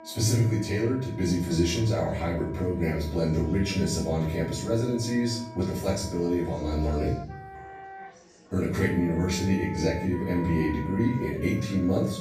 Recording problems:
off-mic speech; far
room echo; noticeable; dies away in 0.5 s
background music; noticeable; throughout; 15 dB below the speech
chatter from many people; faint; throughout; 25 dB below the speech

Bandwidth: 14.5 kHz